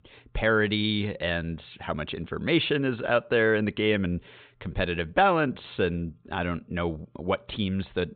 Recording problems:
high frequencies cut off; severe; nothing above 4 kHz

